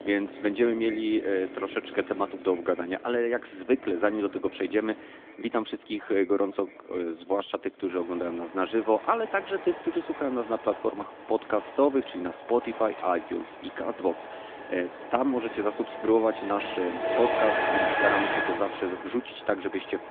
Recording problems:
echo of what is said; faint; throughout; 260 ms later, 25 dB below the speech
phone-call audio; nothing above 3.5 kHz
traffic noise; loud; throughout; 5 dB below the speech

